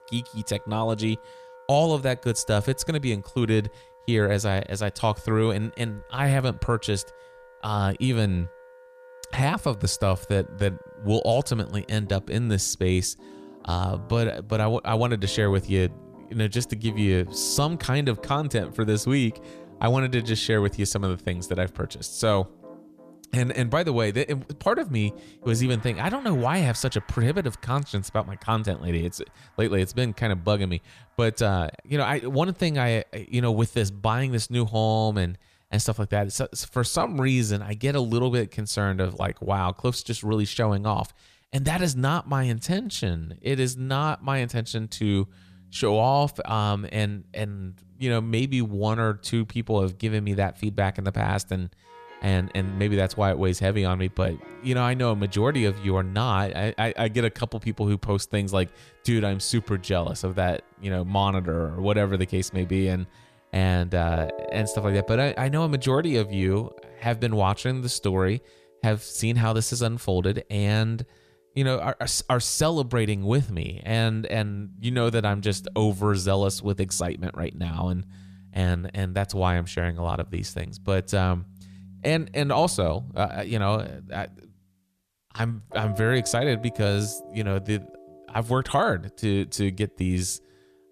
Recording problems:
background music; faint; throughout; 20 dB below the speech

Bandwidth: 14.5 kHz